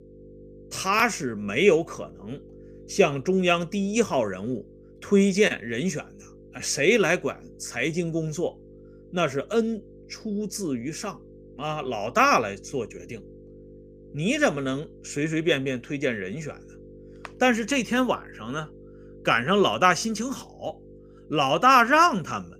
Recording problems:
electrical hum; faint; throughout; 50 Hz, 30 dB below the speech

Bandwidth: 15 kHz